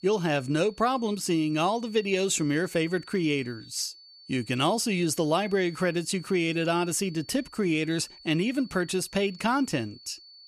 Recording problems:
high-pitched whine; faint; throughout; 4.5 kHz, 20 dB below the speech

